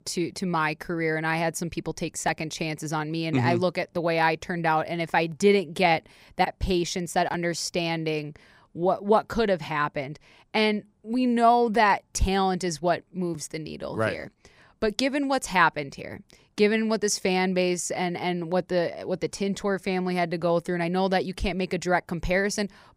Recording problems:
none

